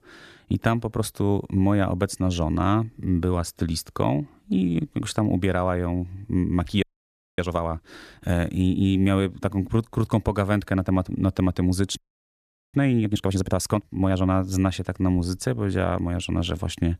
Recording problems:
audio freezing; at 7 s for 0.5 s and at 12 s for 1 s

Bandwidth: 14 kHz